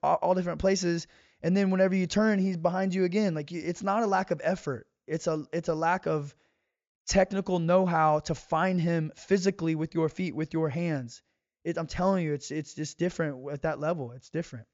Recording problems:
high frequencies cut off; noticeable; nothing above 7.5 kHz

